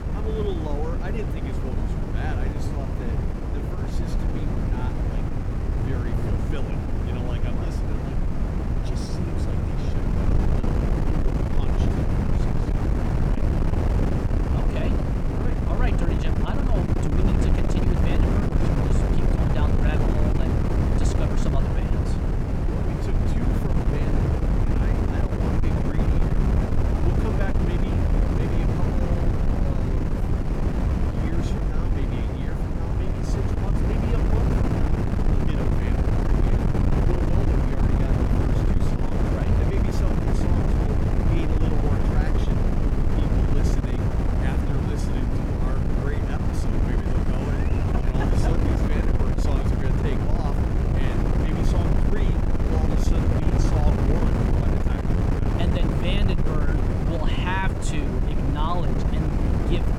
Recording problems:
wind noise on the microphone; heavy; 5 dB above the speech

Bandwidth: 18.5 kHz